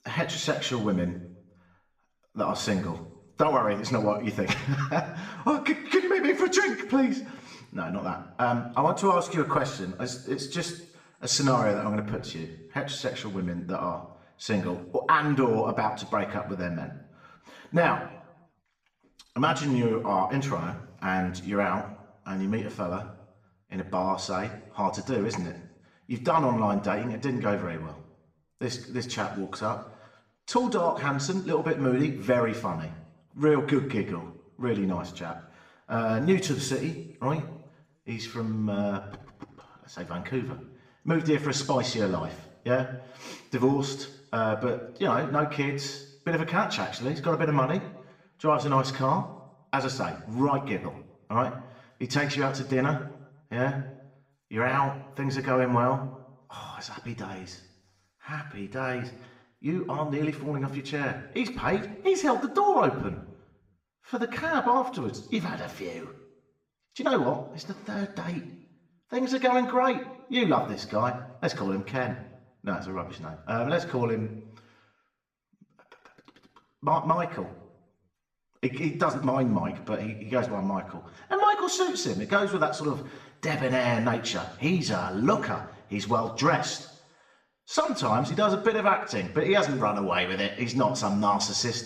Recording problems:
room echo; slight; dies away in 0.7 s
off-mic speech; somewhat distant

